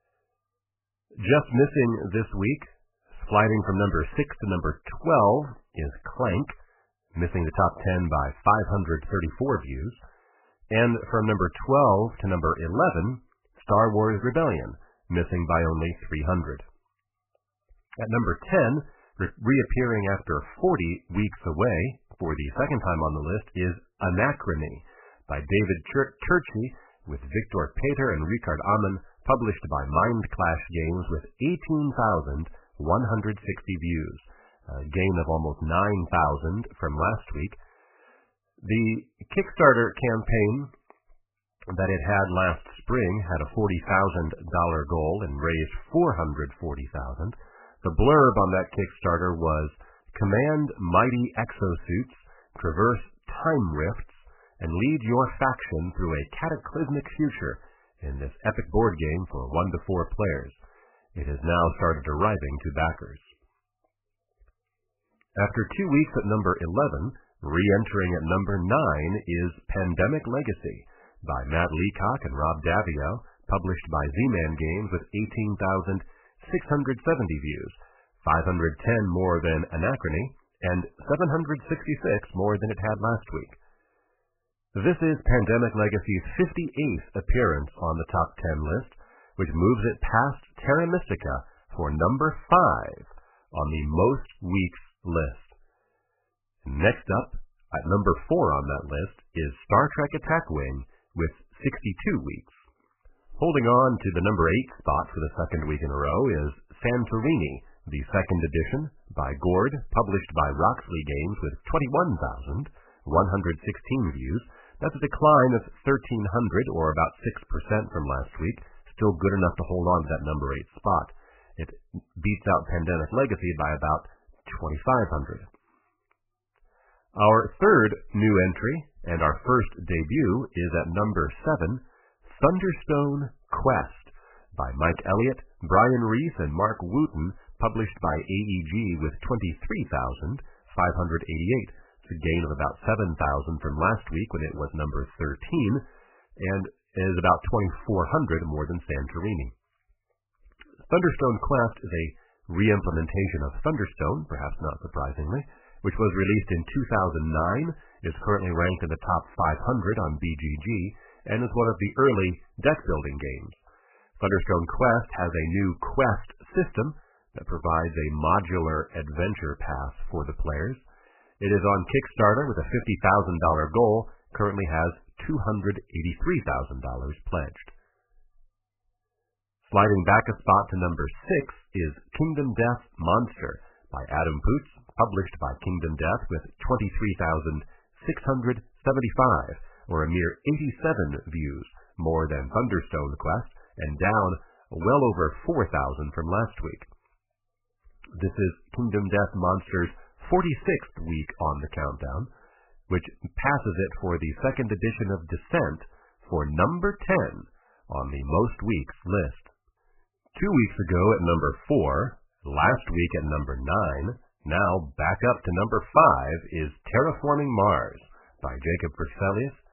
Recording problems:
garbled, watery; badly; nothing above 3 kHz

